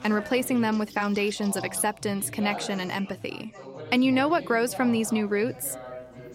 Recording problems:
background chatter; noticeable; throughout; 4 voices, 15 dB below the speech
electrical hum; faint; until 2.5 s and from 4 s on; 60 Hz, 20 dB below the speech

